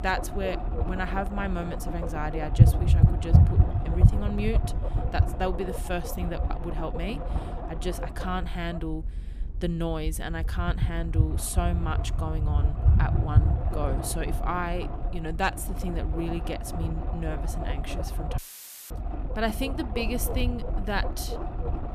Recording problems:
low rumble; loud; throughout; 4 dB below the speech
audio cutting out; filled with static; at 18 s for 0.5 s

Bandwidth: 14.5 kHz